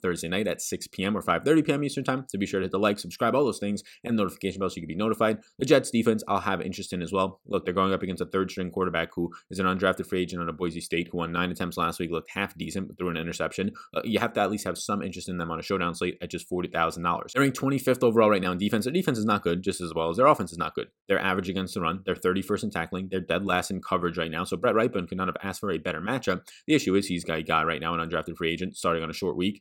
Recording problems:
none

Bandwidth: 17 kHz